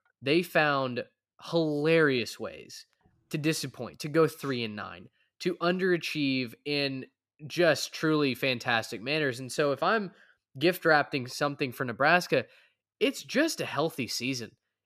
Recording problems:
none

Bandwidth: 14.5 kHz